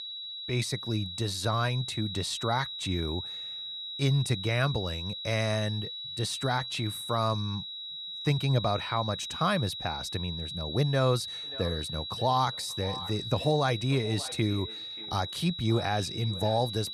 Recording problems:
echo of what is said; noticeable; from 11 s on; 580 ms later, 15 dB below the speech
high-pitched whine; loud; throughout; 4 kHz, 6 dB below the speech

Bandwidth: 13.5 kHz